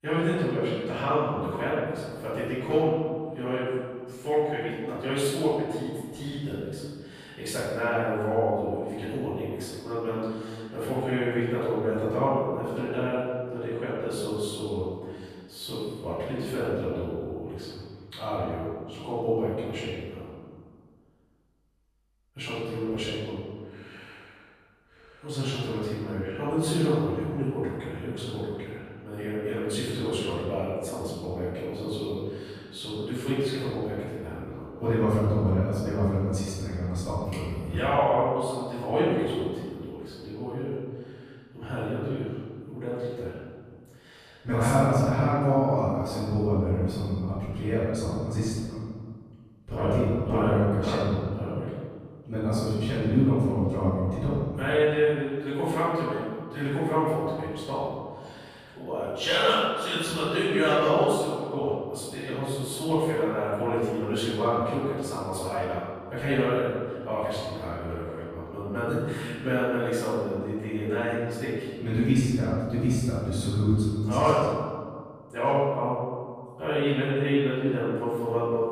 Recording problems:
room echo; strong; dies away in 1.7 s
off-mic speech; far

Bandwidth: 15 kHz